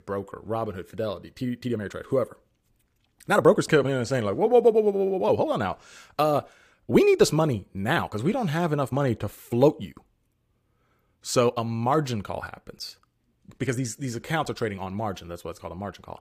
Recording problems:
uneven, jittery; strongly; from 1.5 to 16 s

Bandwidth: 15 kHz